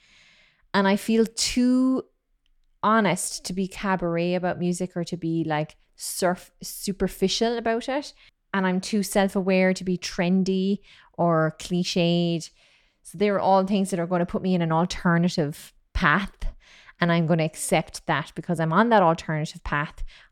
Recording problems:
none

